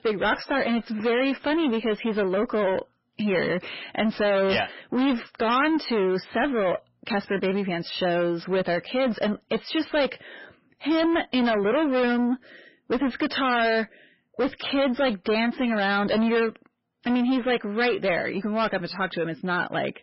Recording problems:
distortion; heavy; 7 dB below the speech
garbled, watery; badly; nothing above 5.5 kHz

